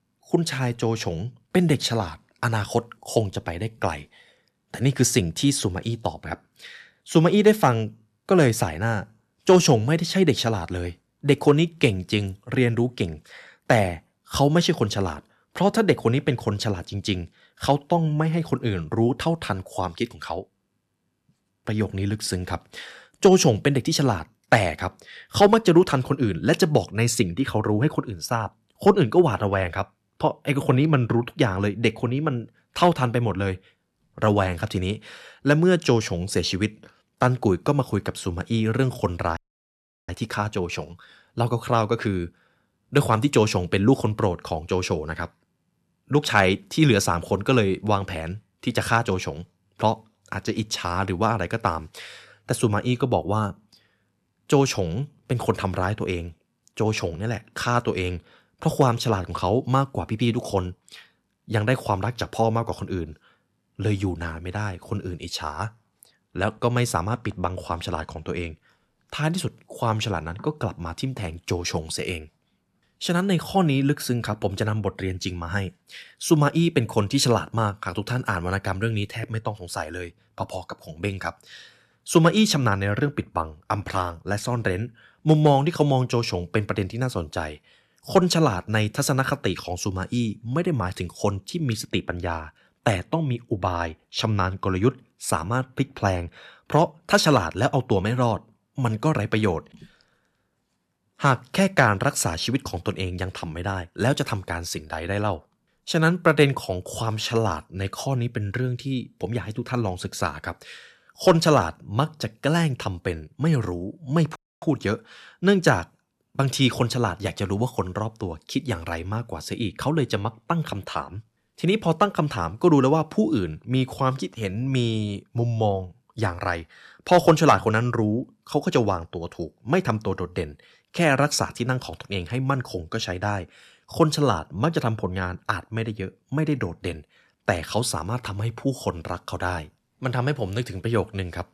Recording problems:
audio cutting out; at 39 s for 0.5 s and at 1:54

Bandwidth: 13.5 kHz